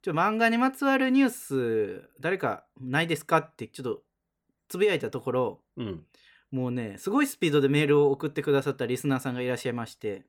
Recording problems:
none

